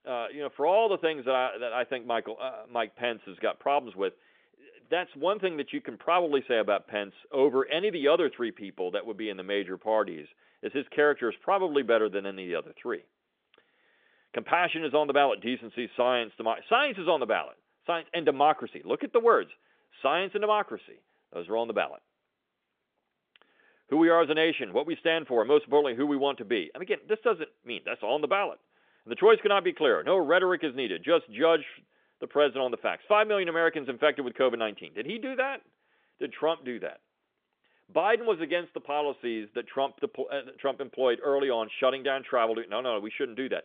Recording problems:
phone-call audio; nothing above 3.5 kHz

